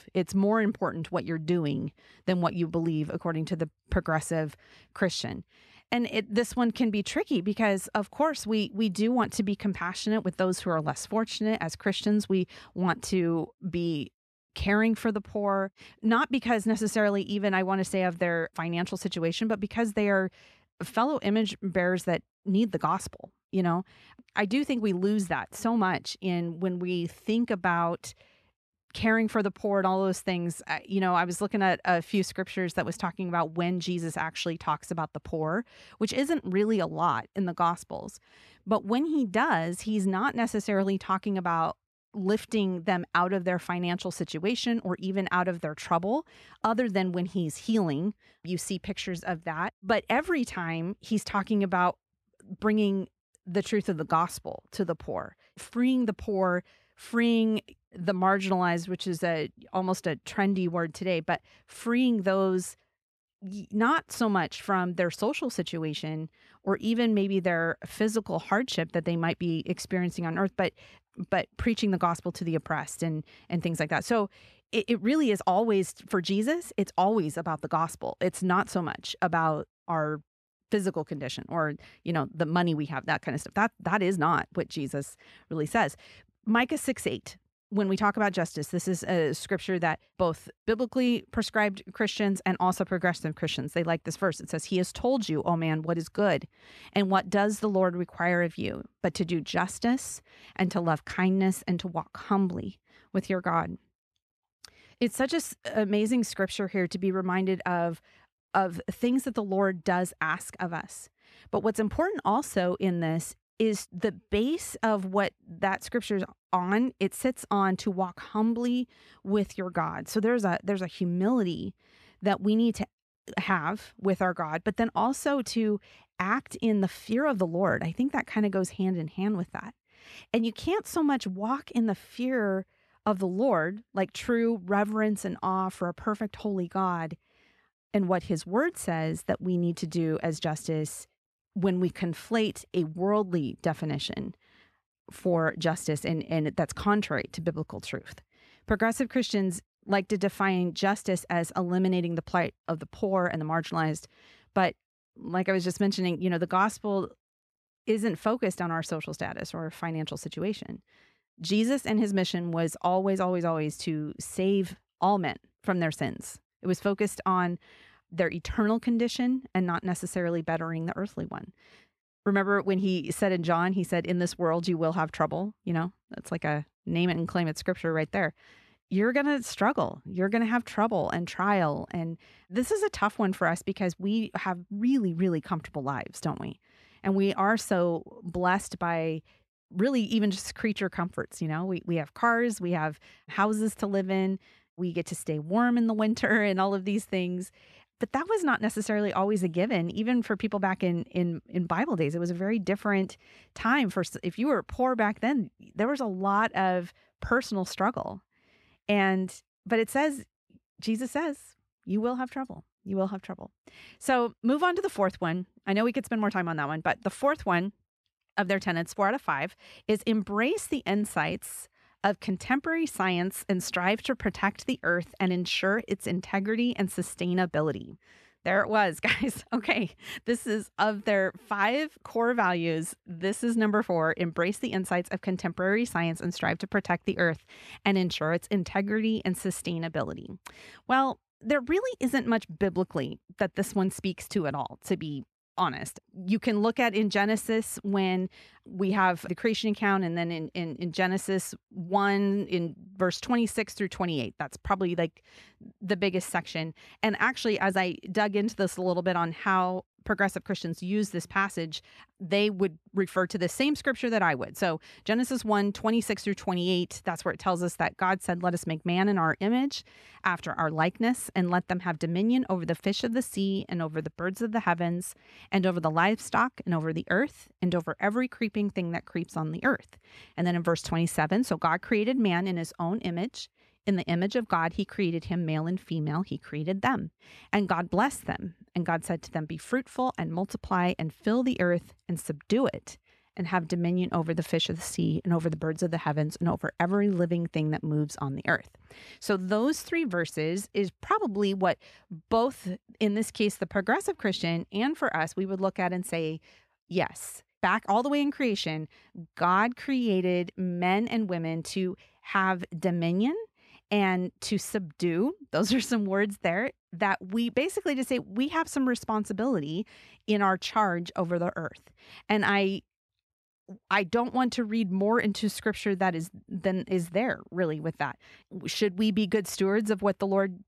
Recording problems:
none

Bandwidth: 13.5 kHz